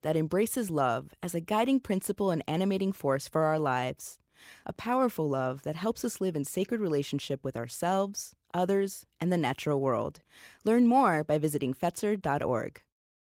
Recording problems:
garbled, watery; slightly; nothing above 16 kHz

